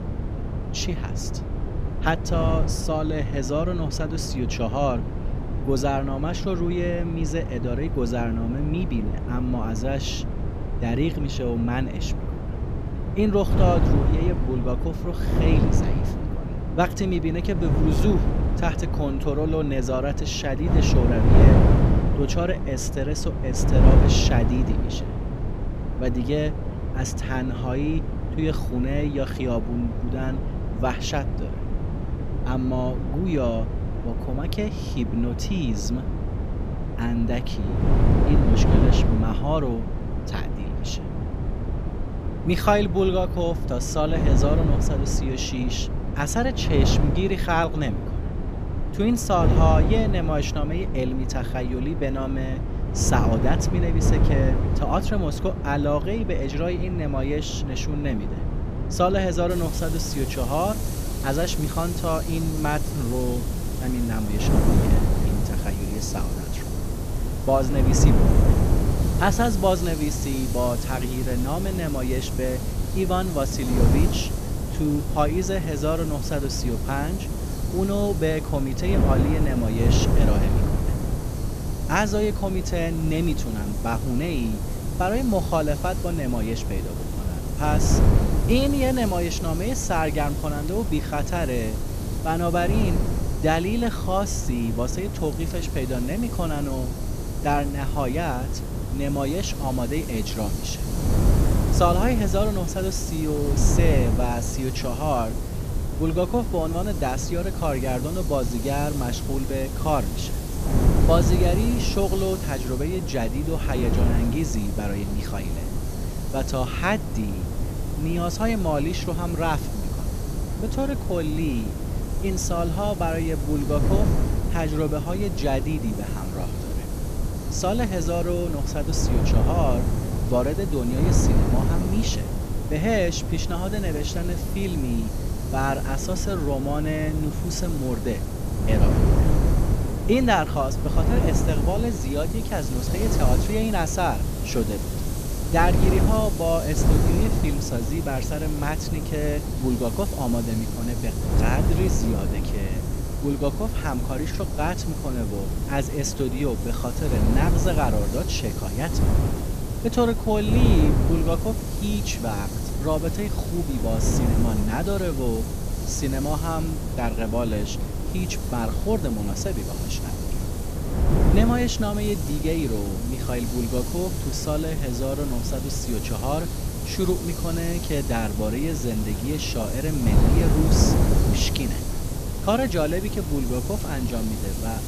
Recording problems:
wind noise on the microphone; heavy; 6 dB below the speech
hiss; noticeable; from 1:00 on; 10 dB below the speech

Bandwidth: 14.5 kHz